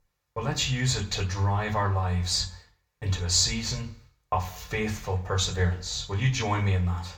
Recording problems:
off-mic speech; far
room echo; slight; dies away in 0.3 s

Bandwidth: 18.5 kHz